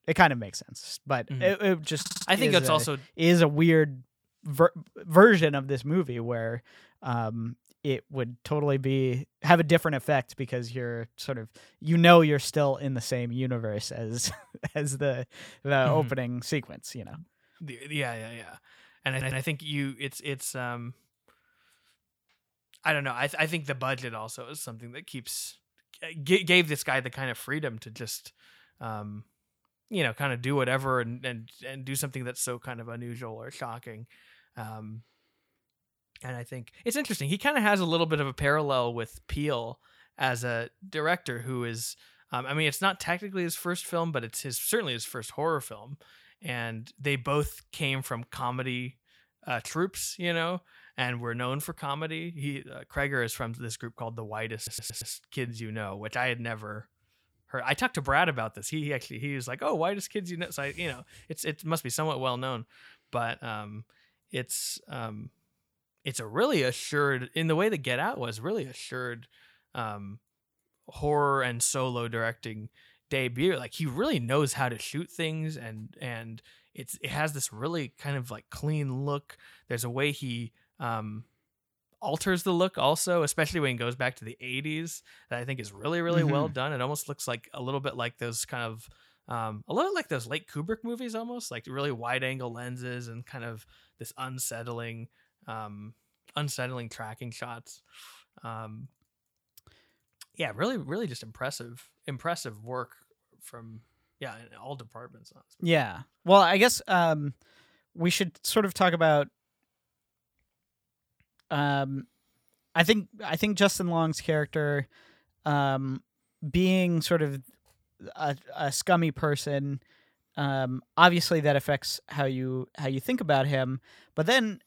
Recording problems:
audio stuttering; at 2 s, at 19 s and at 55 s

